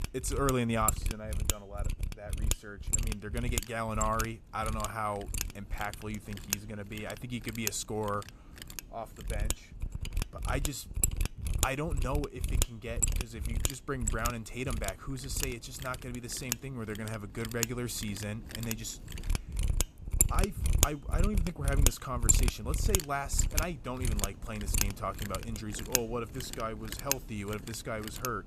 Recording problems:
machinery noise; very loud; throughout; 3 dB above the speech

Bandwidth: 14.5 kHz